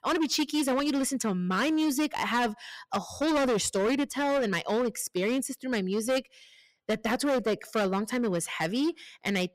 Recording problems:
distortion; heavy; 16% of the sound clipped

